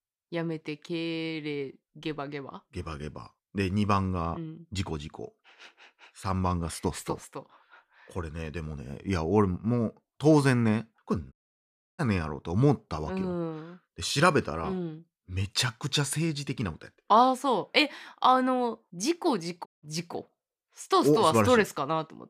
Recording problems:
audio cutting out; at 11 s for 0.5 s and at 20 s

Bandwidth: 14.5 kHz